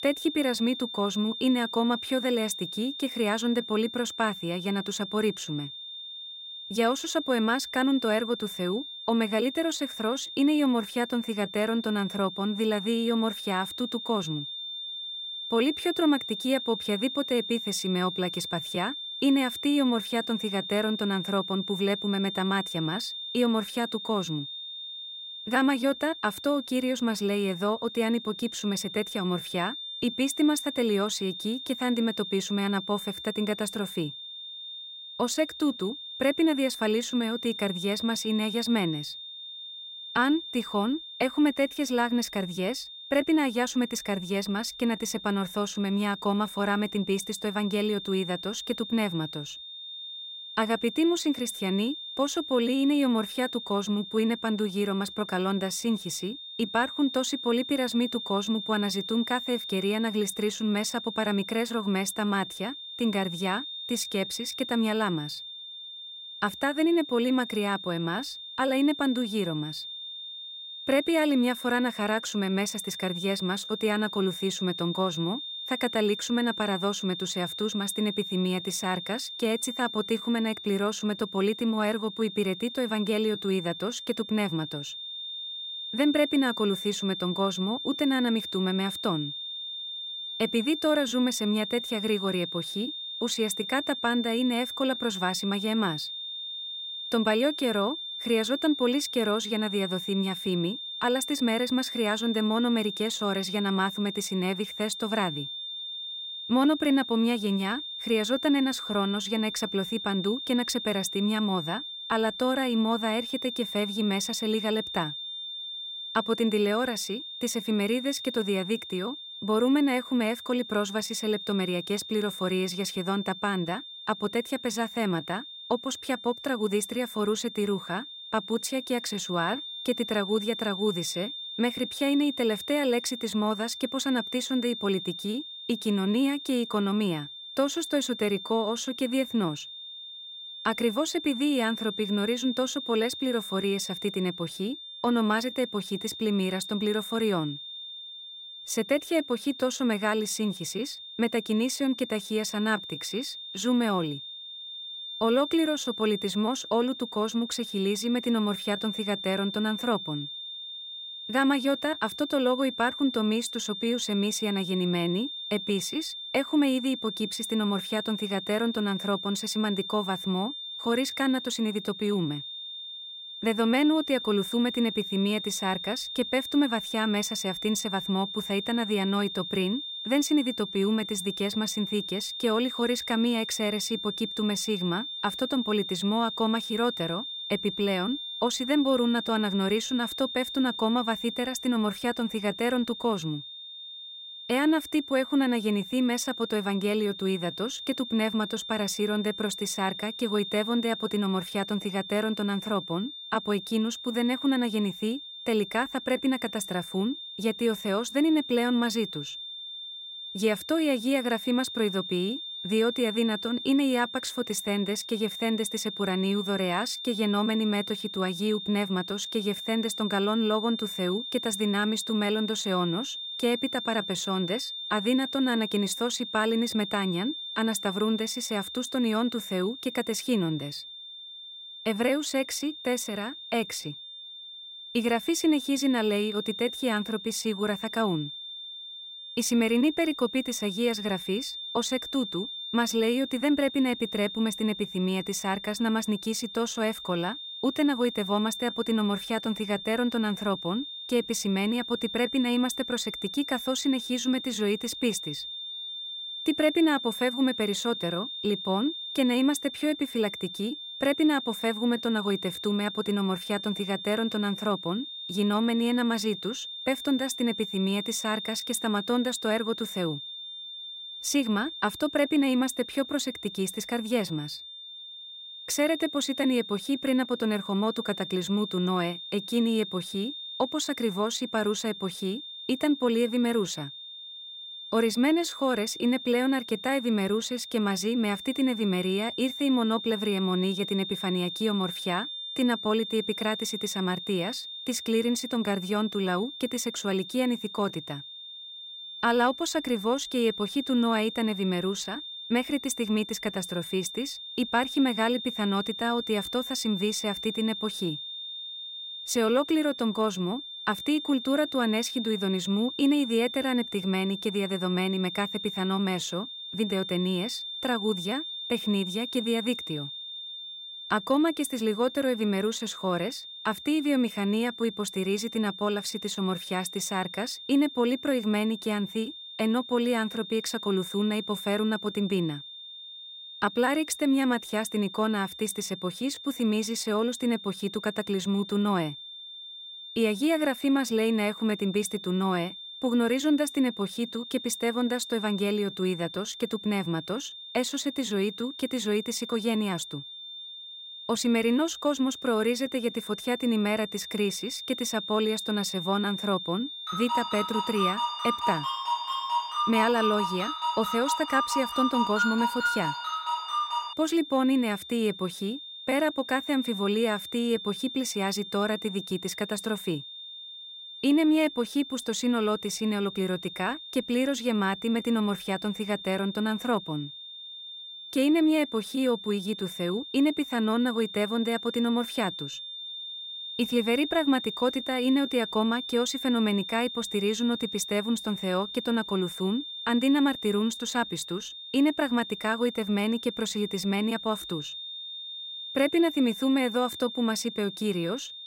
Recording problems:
high-pitched whine; loud; throughout; 3.5 kHz, 8 dB below the speech
phone ringing; loud; from 5:57 to 6:04; peak 1 dB above the speech

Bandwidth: 16 kHz